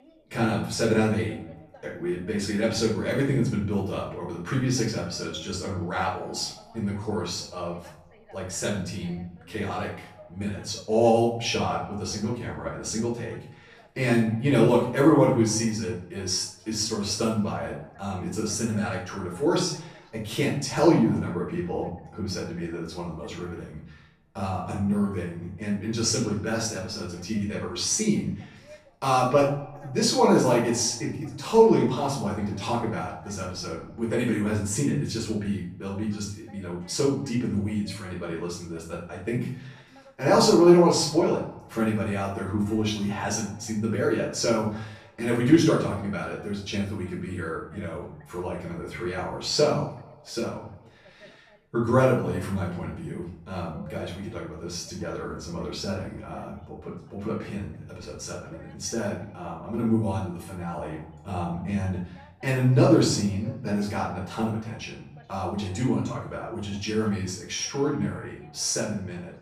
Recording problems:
off-mic speech; far
room echo; noticeable; dies away in 0.5 s
echo of what is said; faint; throughout; 90 ms later, 20 dB below the speech
voice in the background; faint; throughout; 30 dB below the speech

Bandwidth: 14.5 kHz